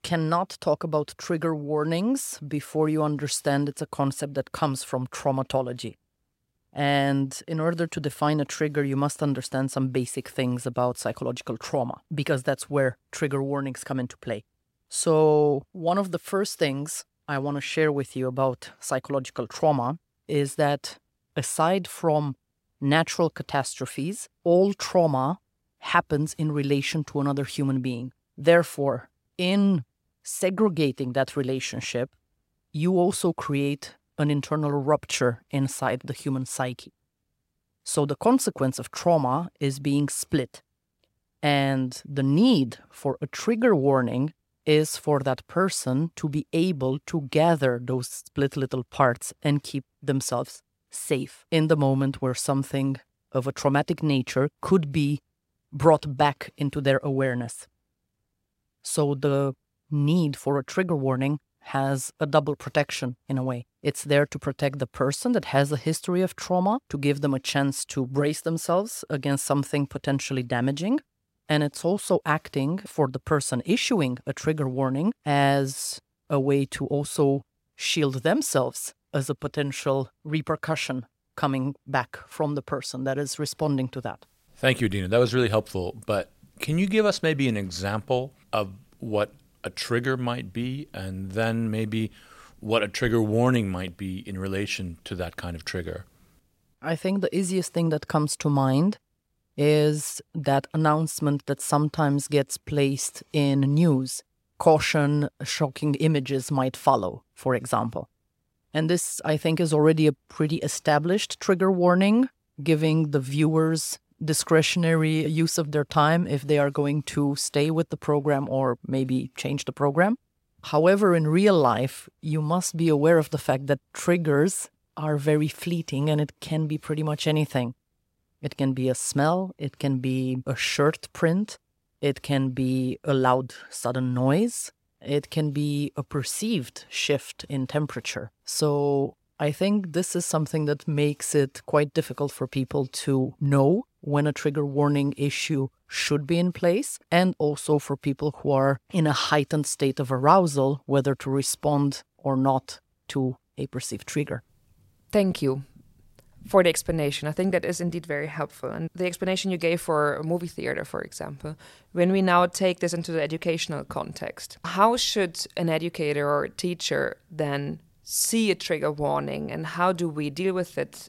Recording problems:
none

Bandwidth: 16 kHz